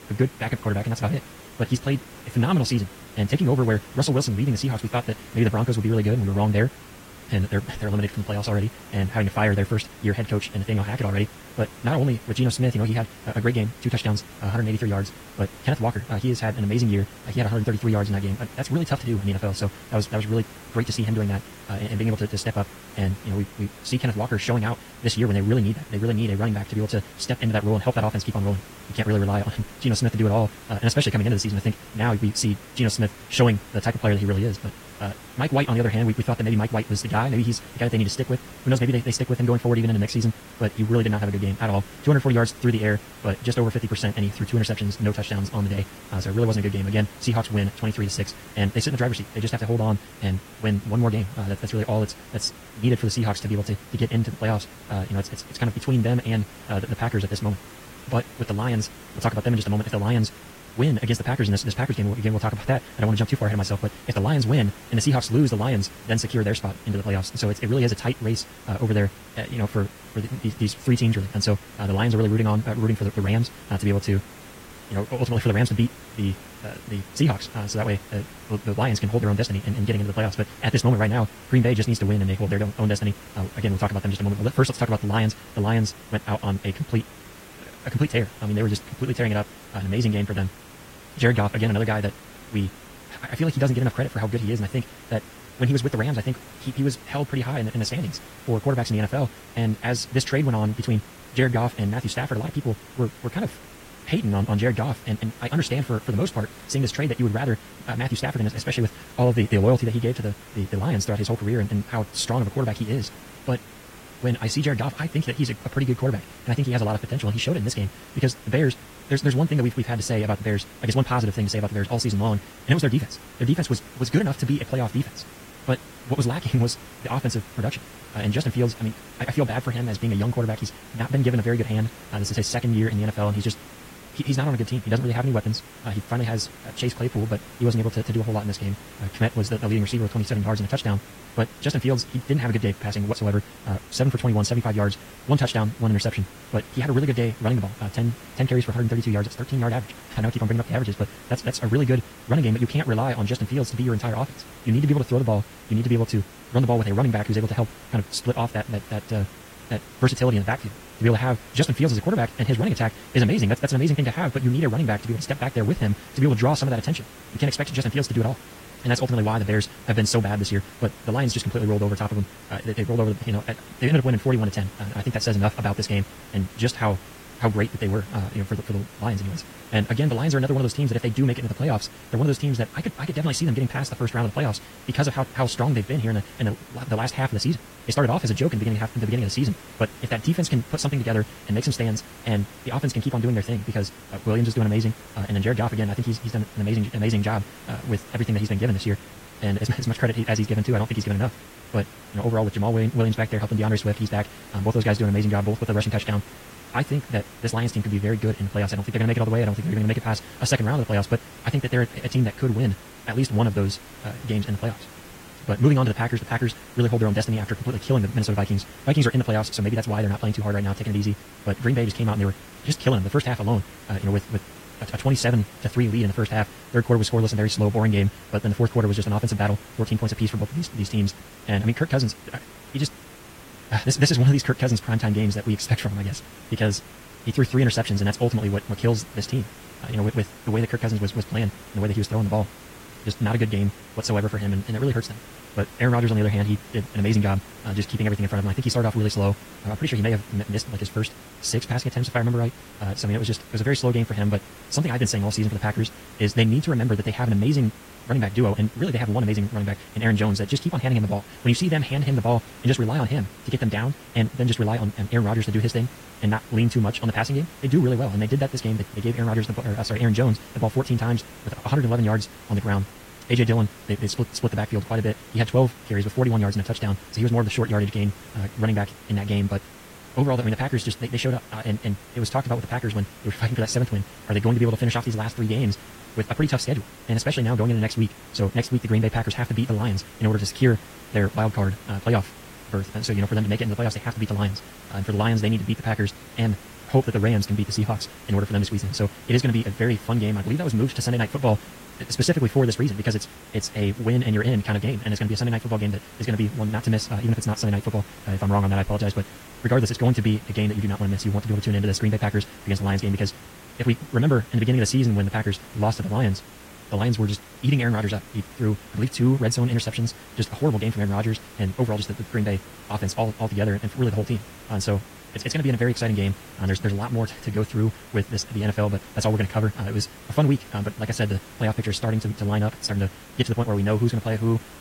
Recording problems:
wrong speed, natural pitch; too fast; 1.8 times normal speed
garbled, watery; slightly; nothing above 14.5 kHz
hiss; noticeable; throughout; 20 dB below the speech

